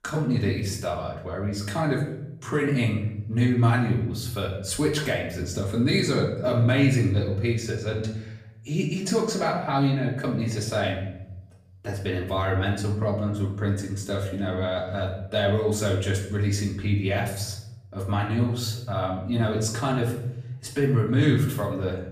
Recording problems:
off-mic speech; far
room echo; noticeable; dies away in 0.8 s

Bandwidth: 15 kHz